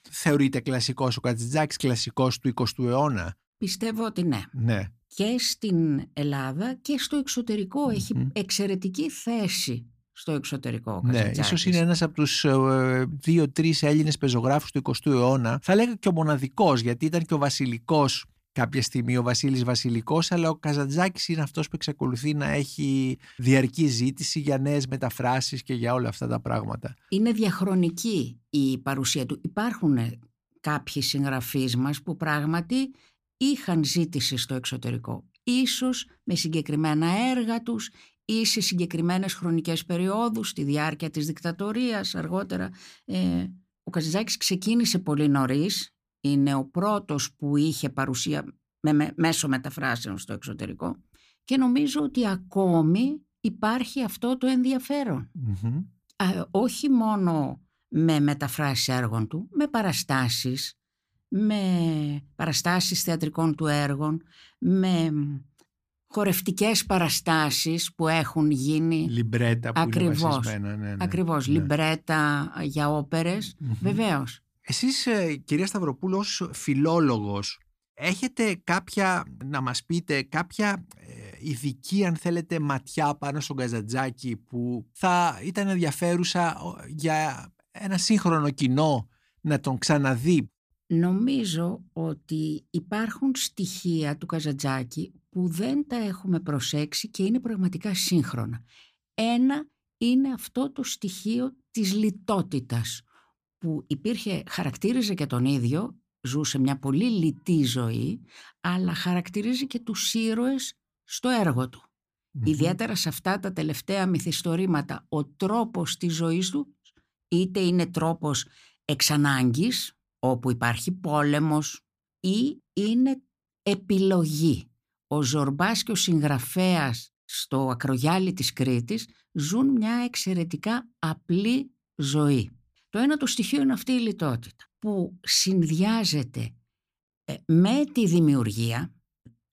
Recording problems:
none

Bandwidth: 15 kHz